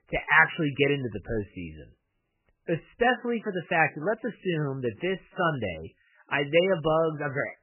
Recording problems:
garbled, watery; badly; nothing above 3 kHz

